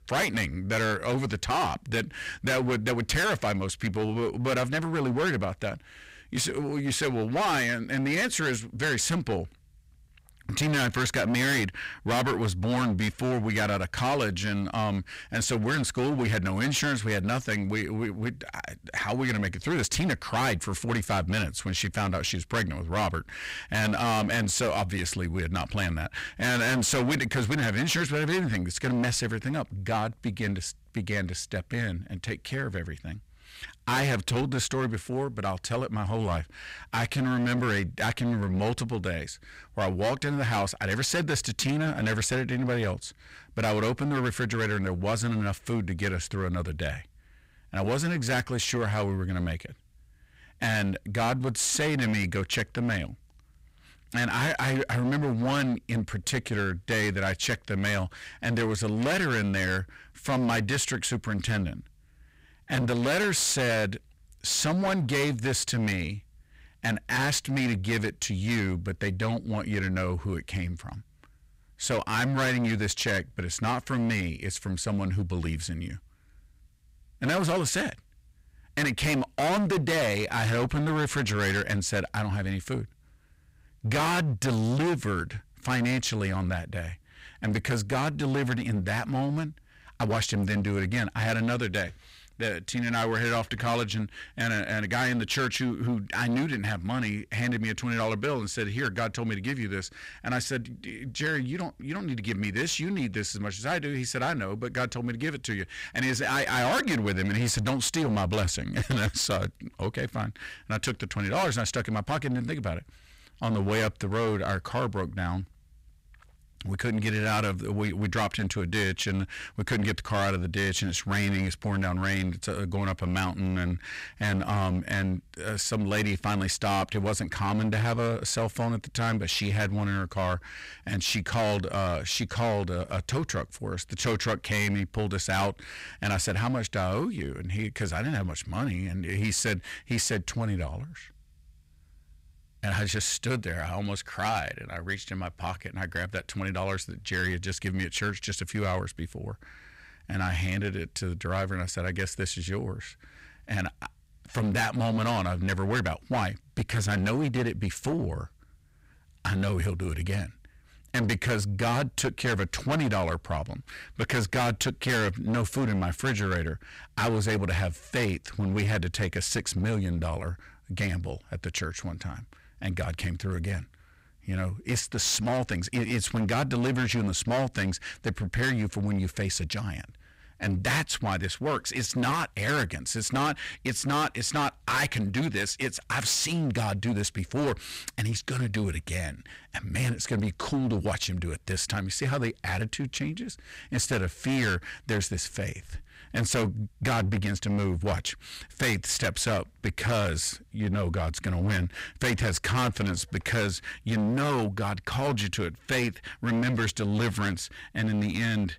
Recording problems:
distortion; heavy; 16% of the sound clipped

